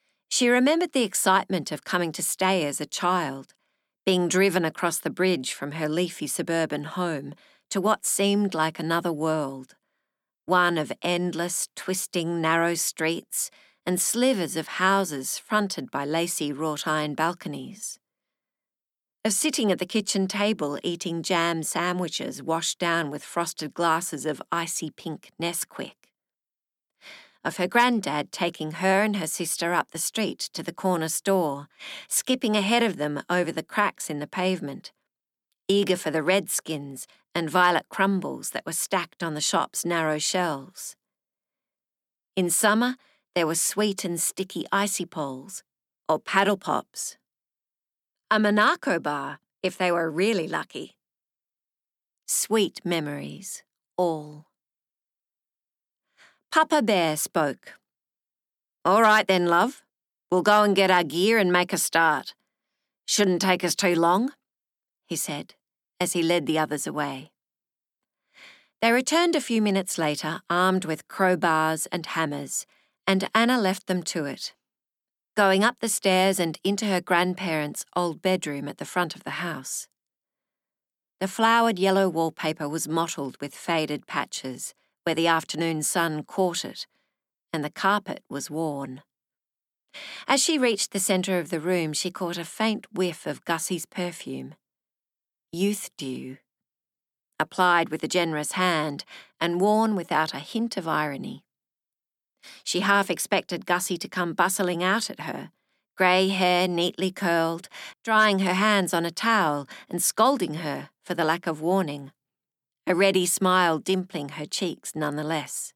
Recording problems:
none

